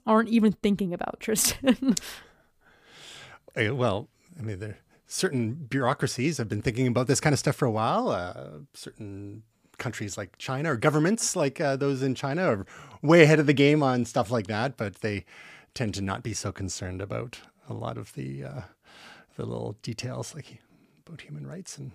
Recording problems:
none

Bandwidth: 15 kHz